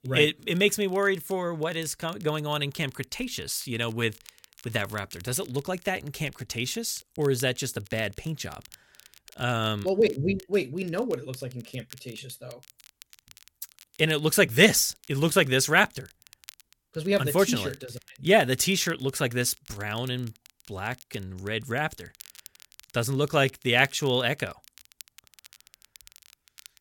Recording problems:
crackle, like an old record; faint; 25 dB below the speech

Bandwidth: 17 kHz